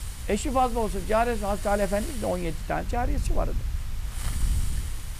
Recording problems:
wind noise on the microphone; occasional gusts; 25 dB below the speech
hiss; noticeable; throughout; 15 dB below the speech

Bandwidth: 14.5 kHz